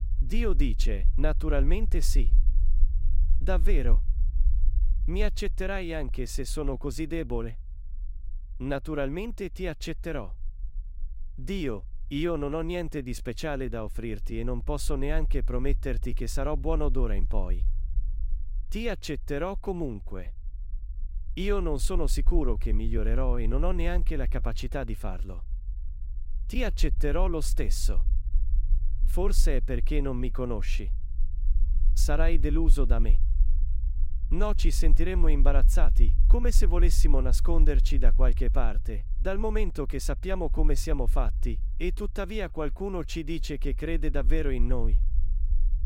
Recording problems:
low rumble; faint; throughout; 20 dB below the speech

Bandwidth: 16 kHz